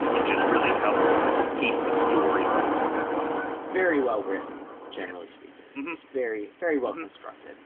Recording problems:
phone-call audio
wind in the background; very loud; throughout; 4 dB above the speech

